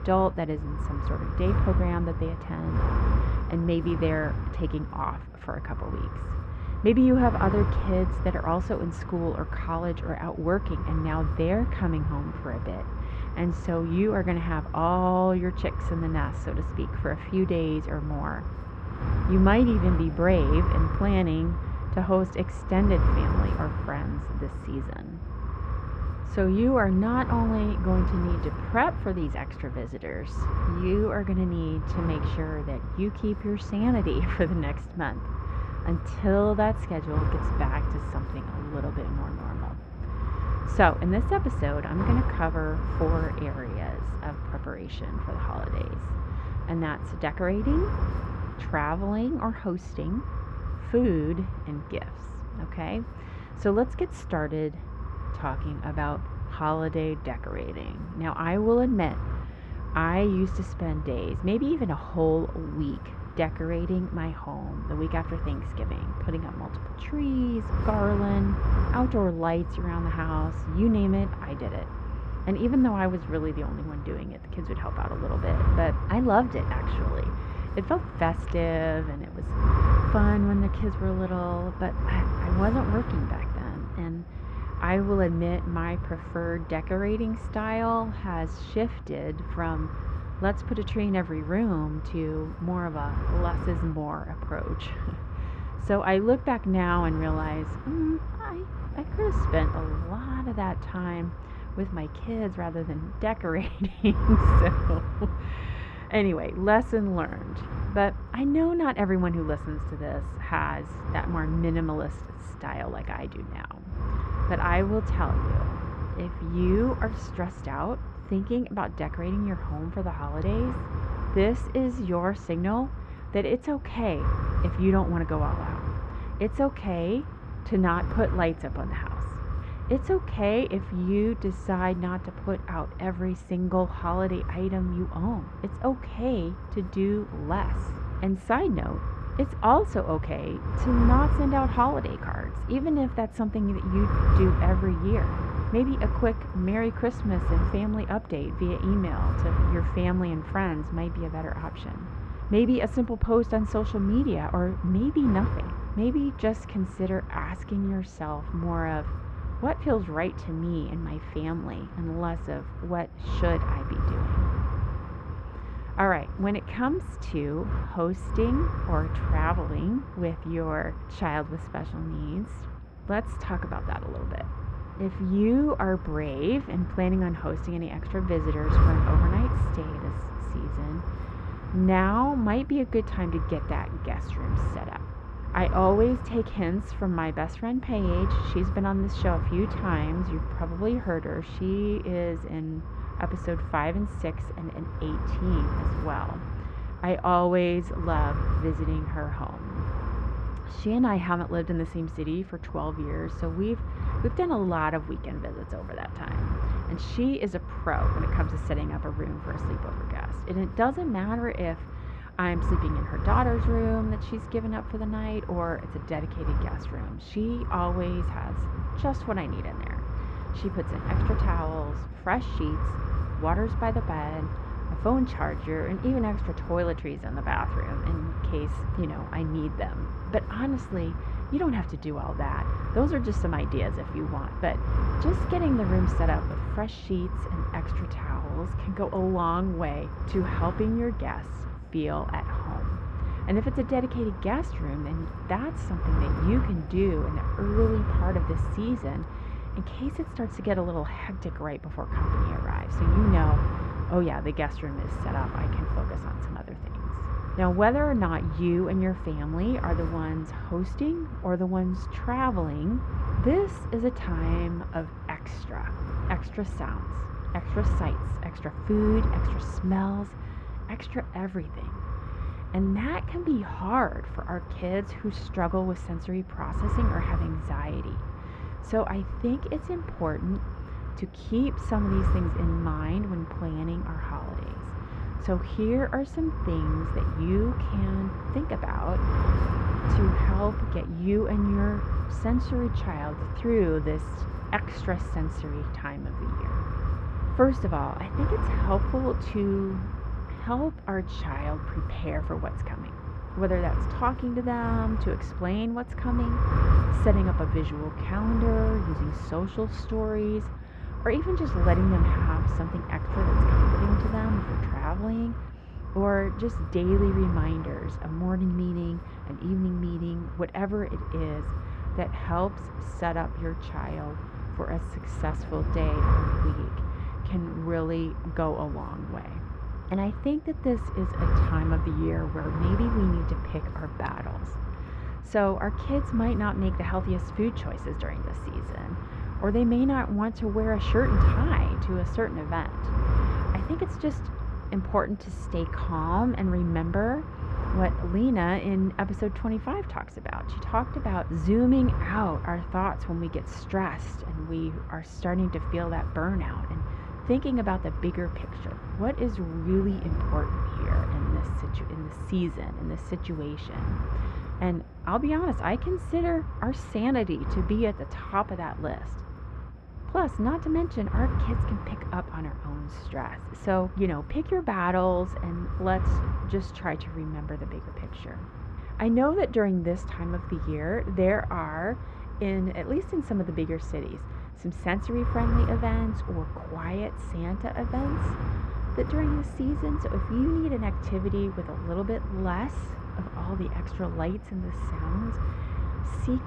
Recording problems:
muffled; very; fading above 2 kHz
wind noise on the microphone; heavy; 9 dB below the speech

